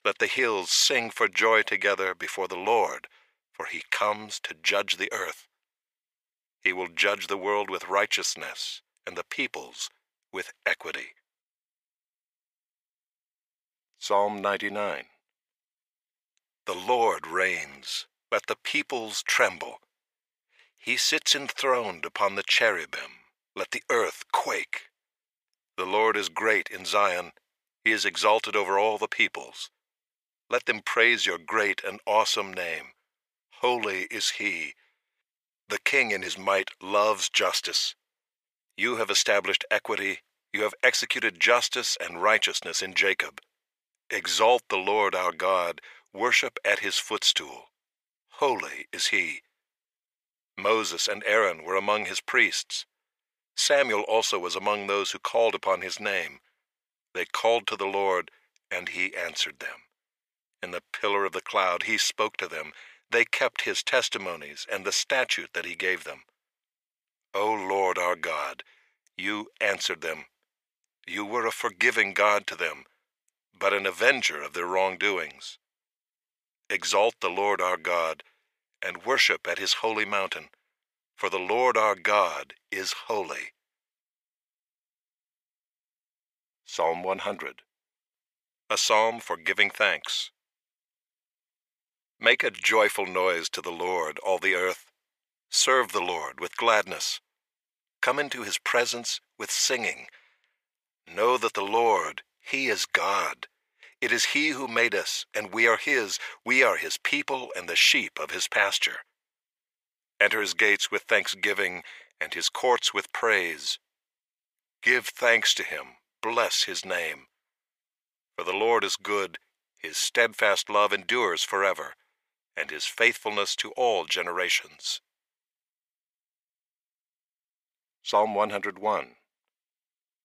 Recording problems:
thin; very; fading below 600 Hz

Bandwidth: 15 kHz